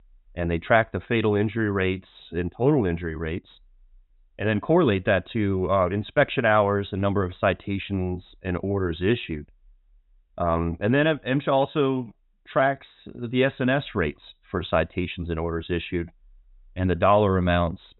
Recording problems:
high frequencies cut off; severe; nothing above 4 kHz

